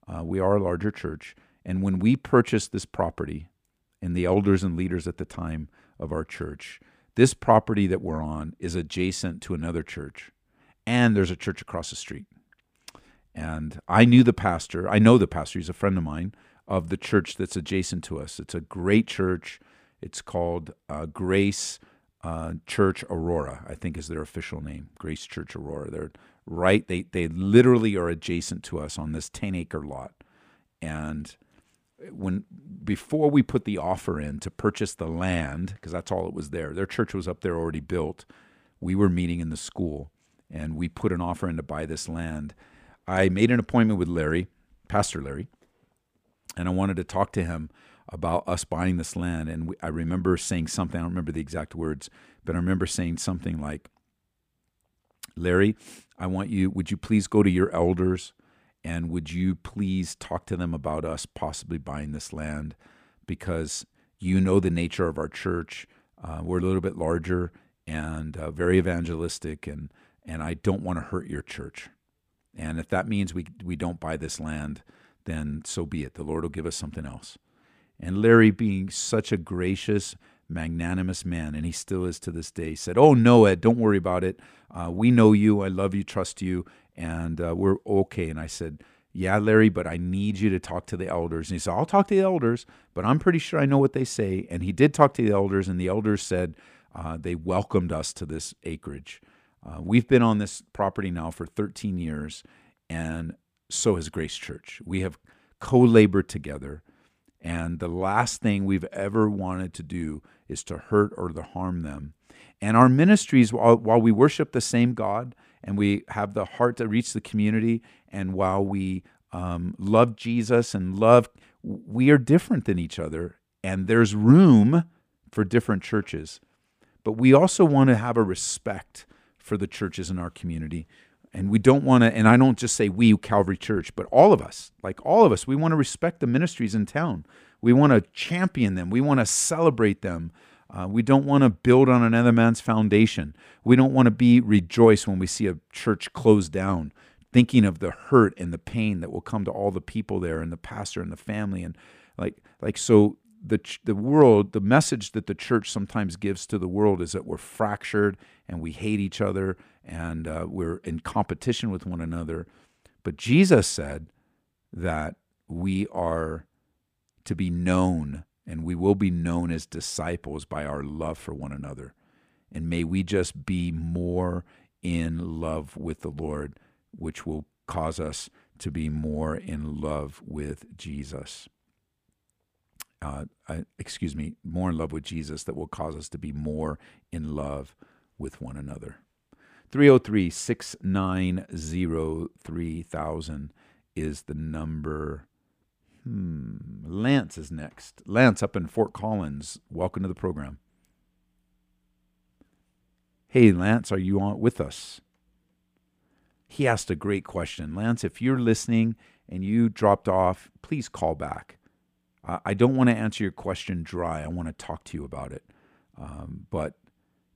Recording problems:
none

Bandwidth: 15 kHz